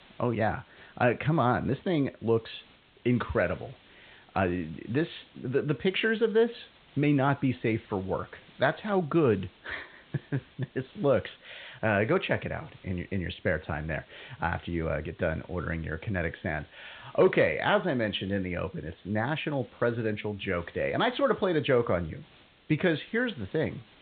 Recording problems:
high frequencies cut off; severe; nothing above 4 kHz
hiss; faint; throughout; 30 dB below the speech

